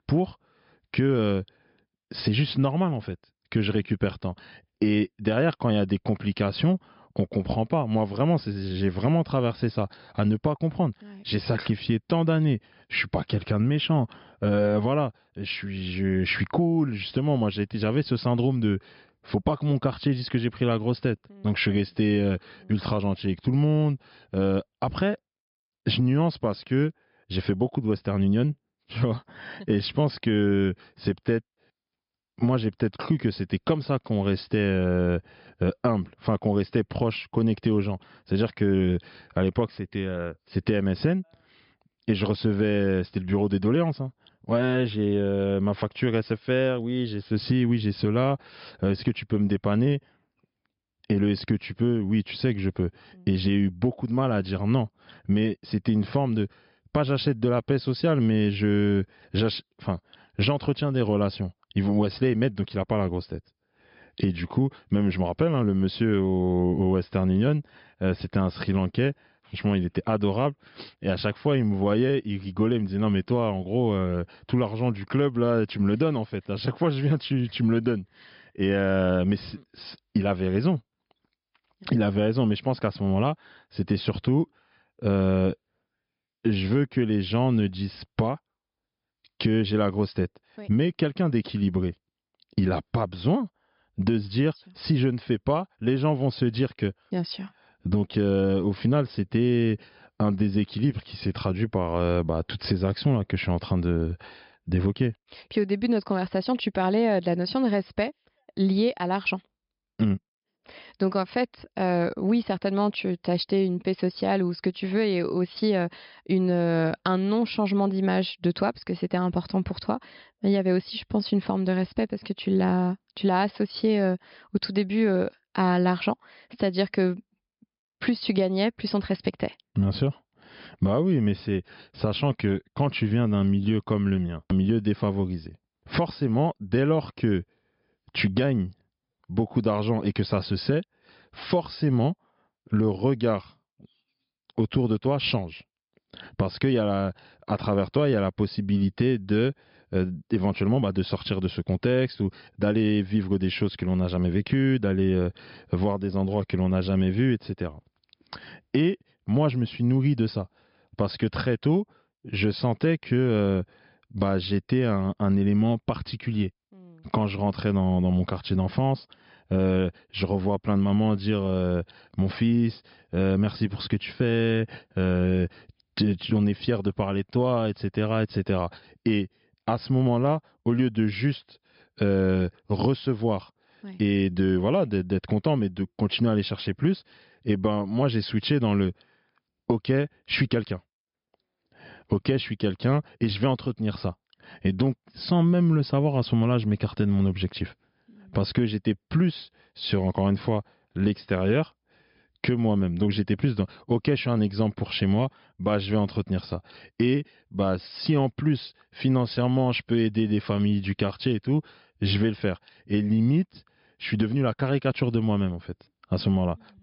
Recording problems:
high frequencies cut off; noticeable; nothing above 5.5 kHz

